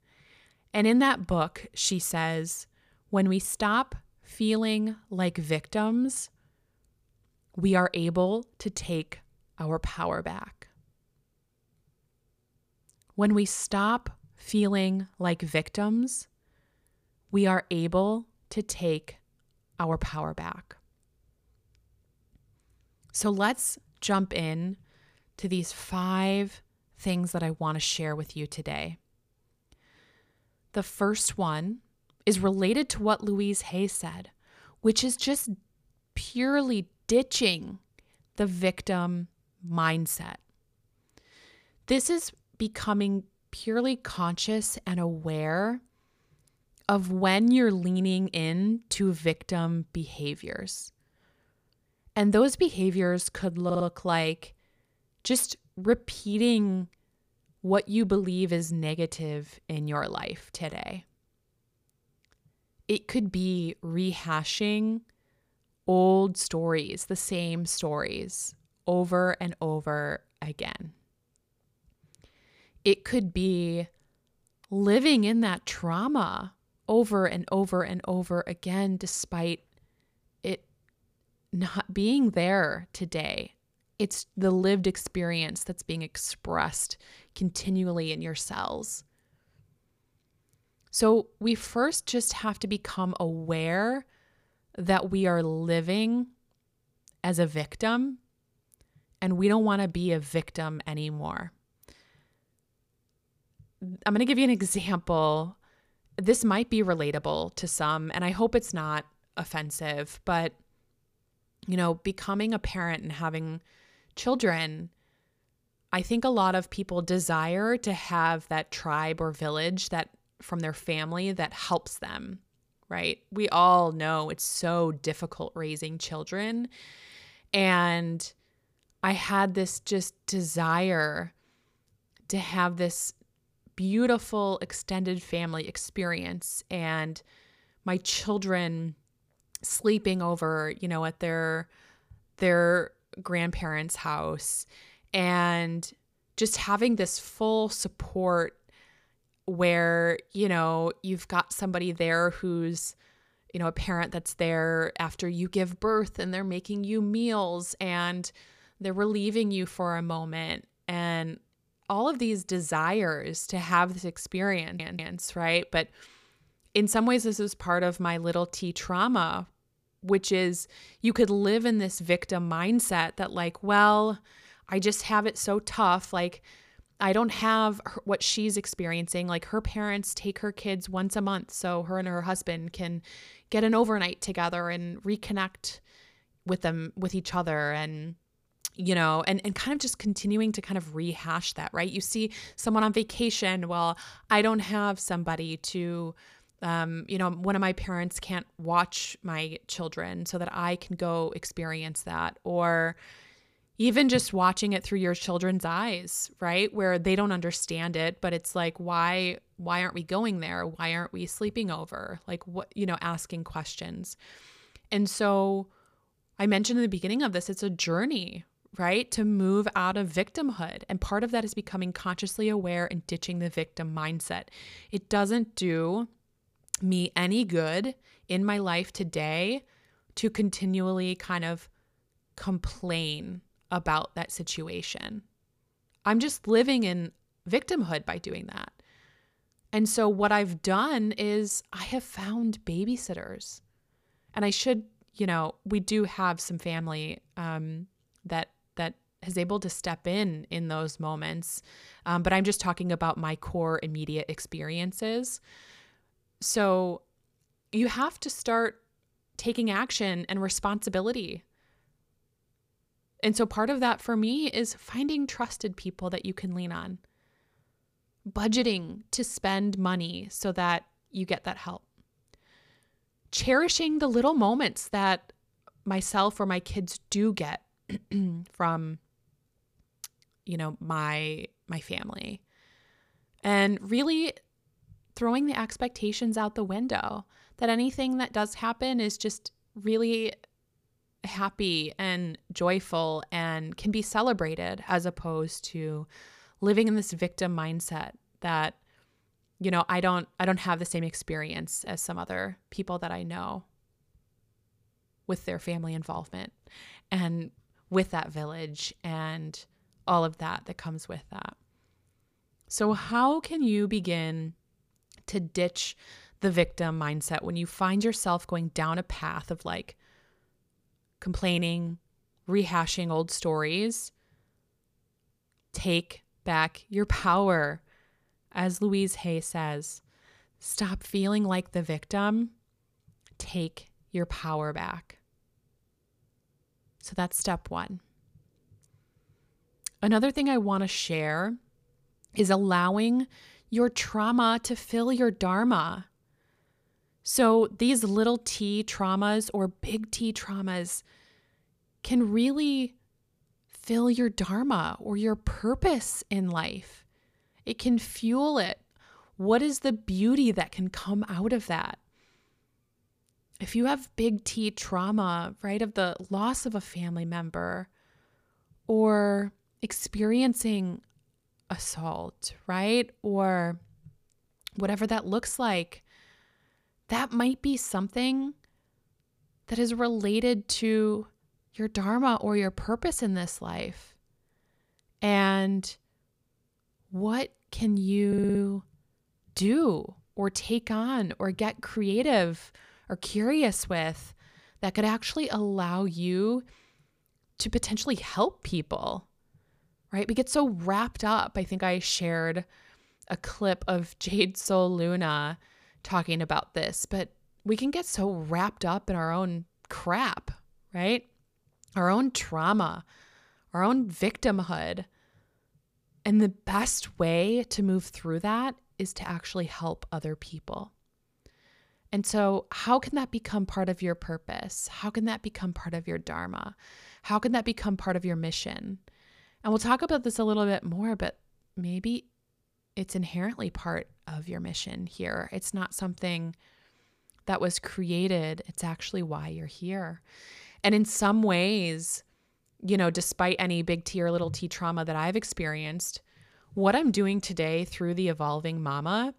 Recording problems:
audio stuttering; at 54 s, at 2:45 and at 6:28

